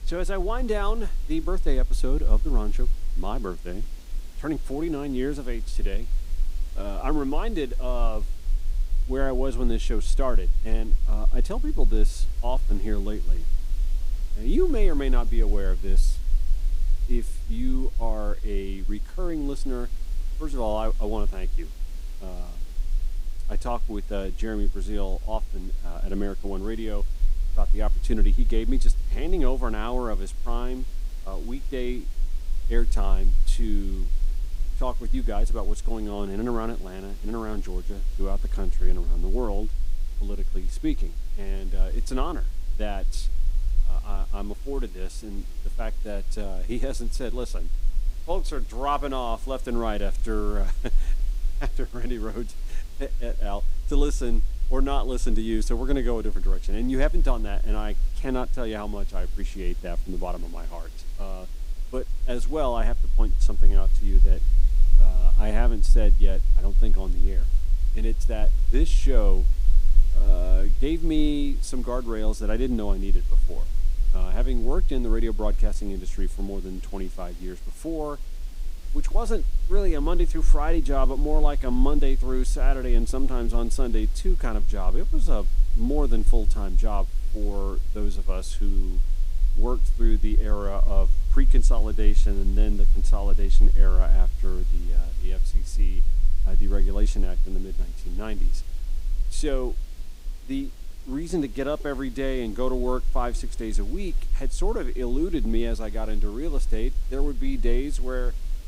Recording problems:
hiss; noticeable; throughout; 20 dB below the speech
low rumble; faint; throughout; 25 dB below the speech

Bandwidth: 15.5 kHz